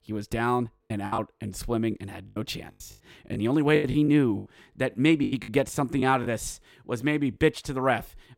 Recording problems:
choppy; very; 9% of the speech affected

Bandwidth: 16.5 kHz